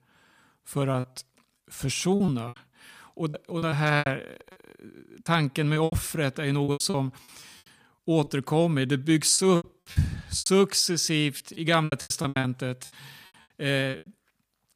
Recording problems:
choppy; very; 15% of the speech affected

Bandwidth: 15 kHz